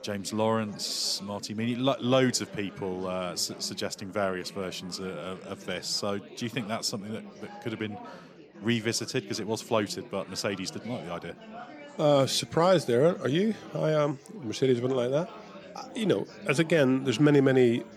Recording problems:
chatter from many people; noticeable; throughout; 20 dB below the speech

